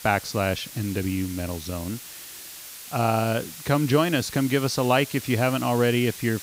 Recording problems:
hiss; noticeable; throughout; 15 dB below the speech

